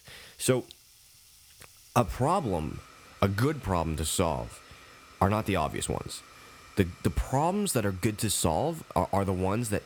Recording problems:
household noises; faint; throughout; 25 dB below the speech

